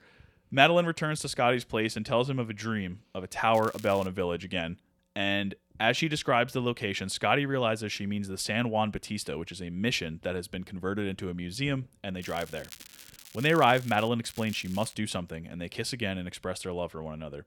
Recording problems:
crackling; noticeable; at 3.5 s, from 12 to 14 s and at 14 s; 20 dB below the speech

